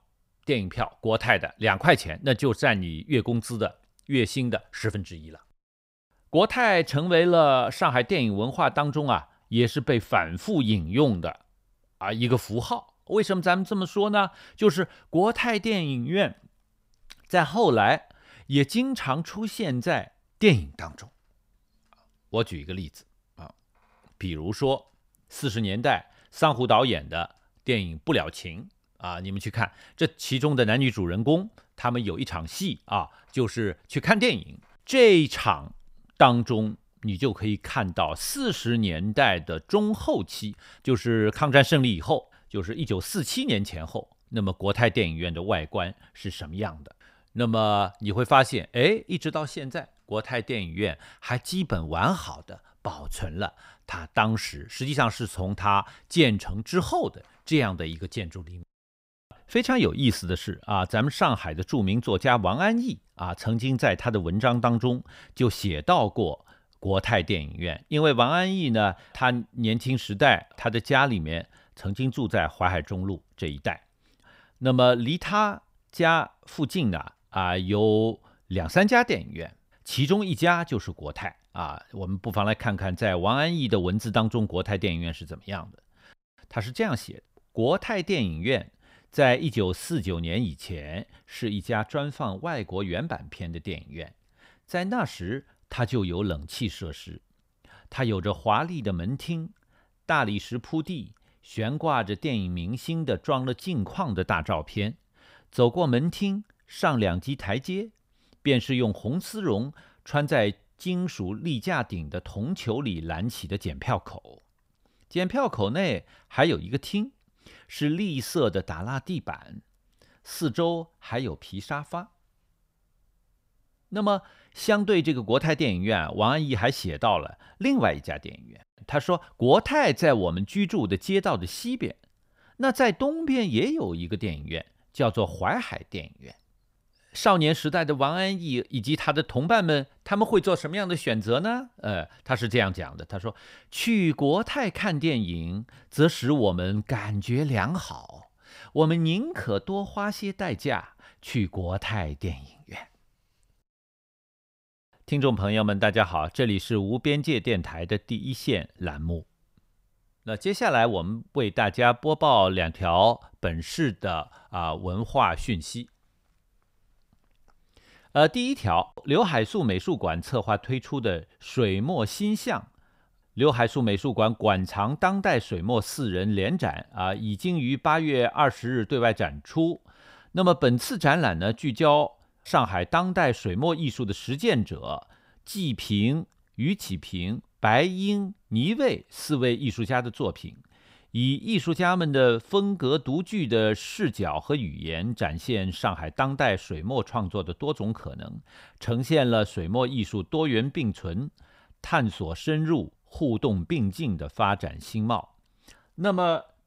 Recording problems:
none

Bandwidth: 15.5 kHz